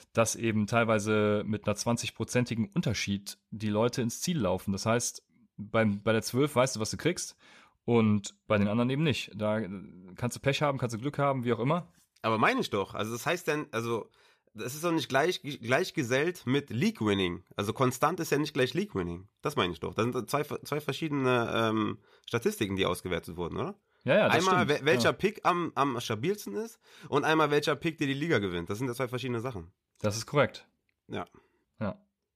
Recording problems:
none

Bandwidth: 14.5 kHz